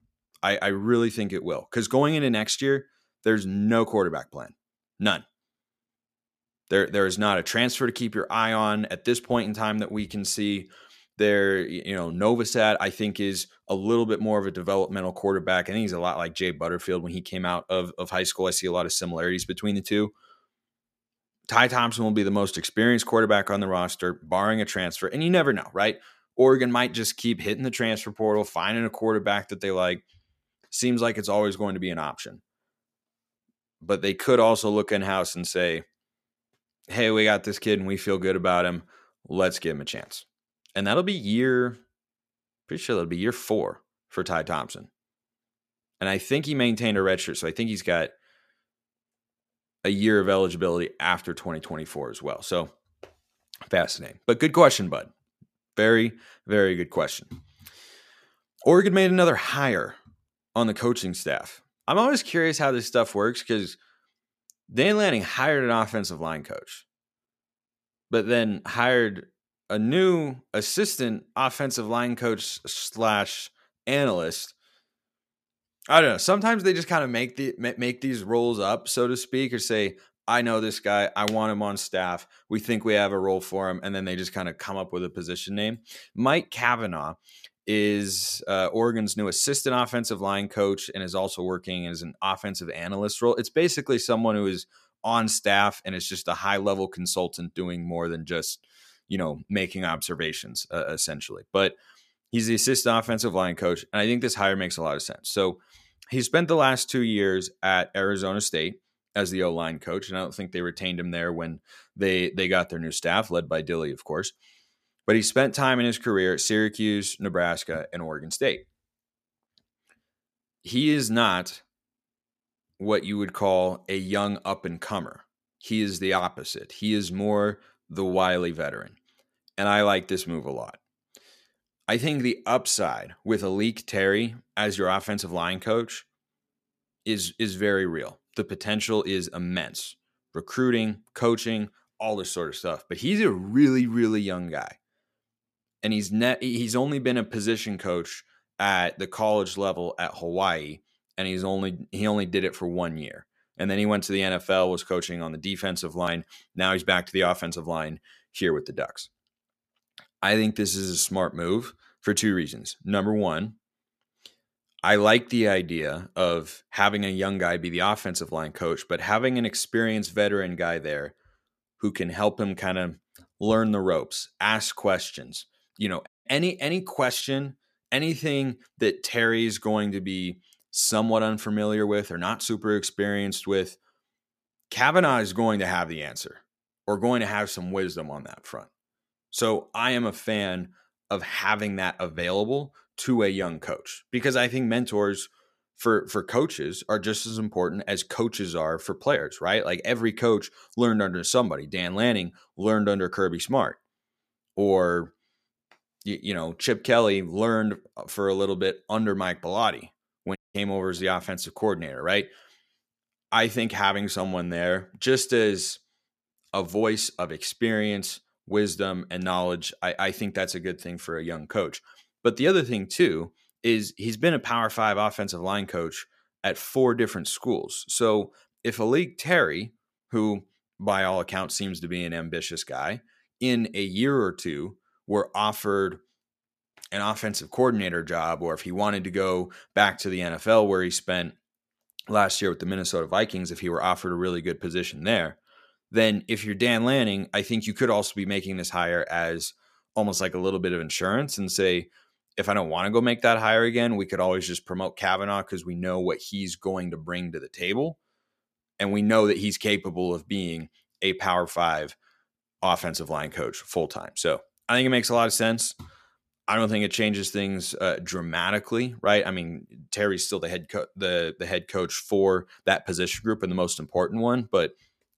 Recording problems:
audio cutting out; at 2:56 and at 3:30

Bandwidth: 14.5 kHz